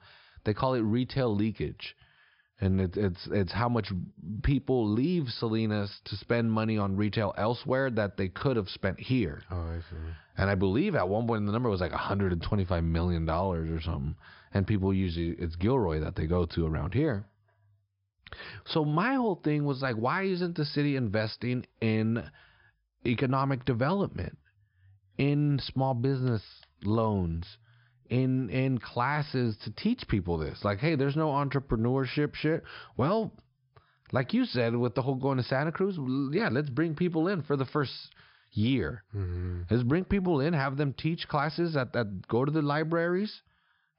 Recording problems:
high frequencies cut off; noticeable; nothing above 5.5 kHz

